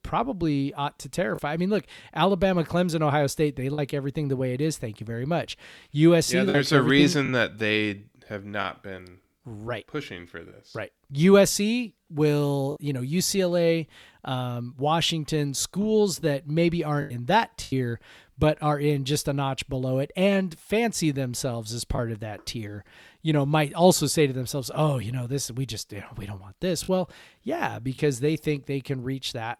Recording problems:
choppy; occasionally; 2% of the speech affected

